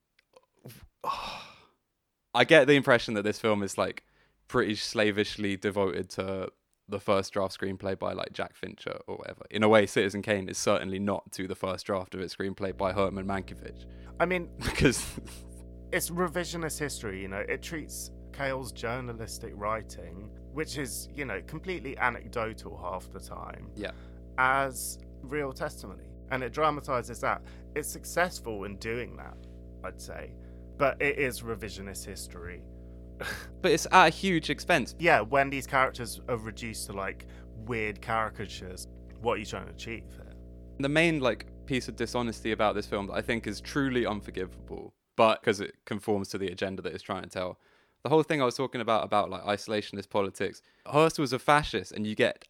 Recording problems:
electrical hum; faint; from 13 to 45 s; 60 Hz, 30 dB below the speech

